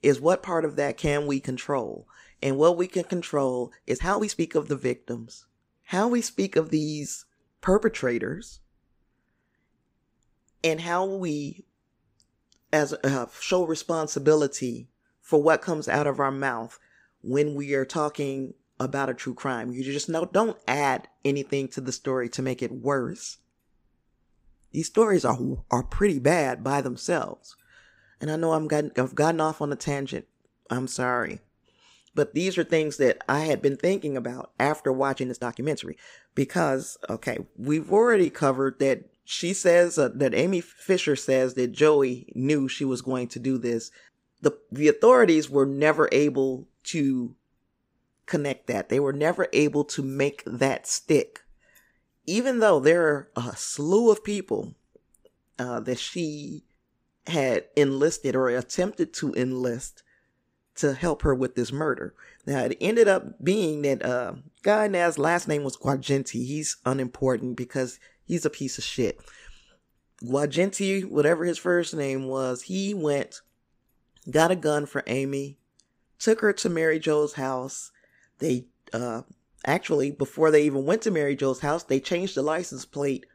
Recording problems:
uneven, jittery; strongly; from 4 s to 1:12

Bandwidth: 15.5 kHz